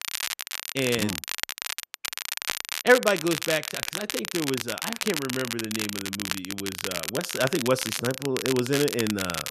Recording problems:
crackle, like an old record; loud; 3 dB below the speech

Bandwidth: 14 kHz